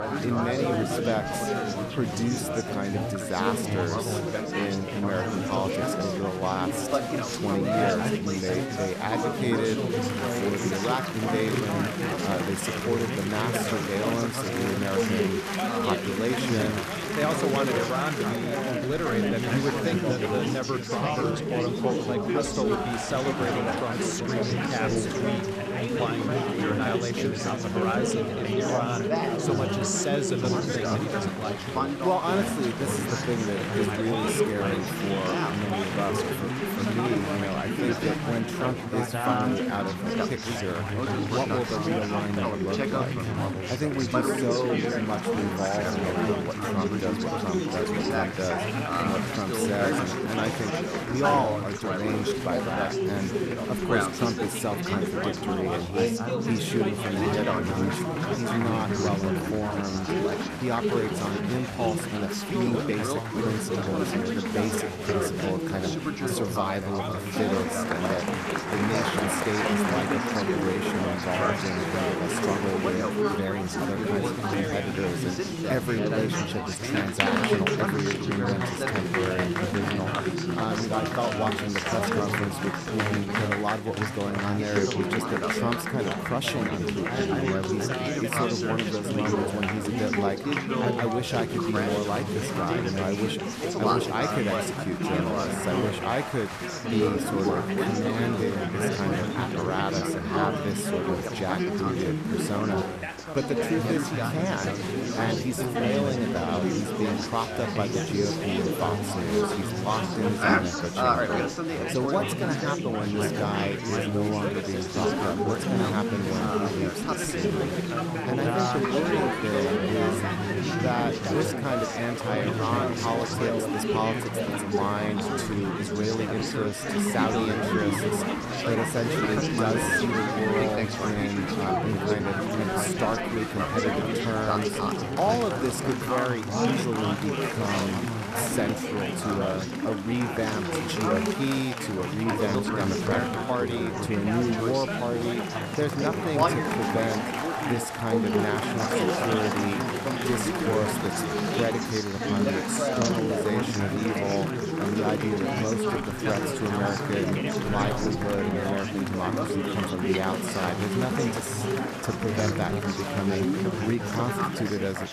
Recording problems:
chatter from many people; very loud; throughout; 3 dB above the speech

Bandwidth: 14 kHz